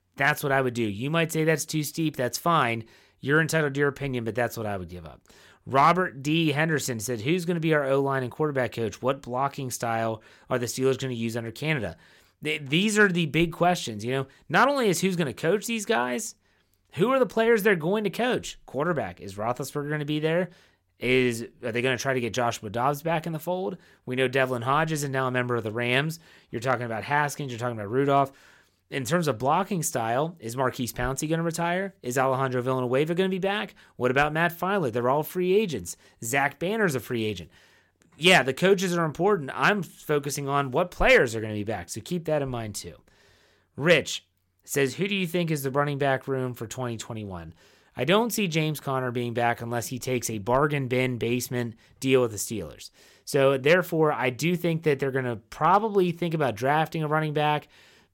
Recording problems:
none

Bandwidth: 16.5 kHz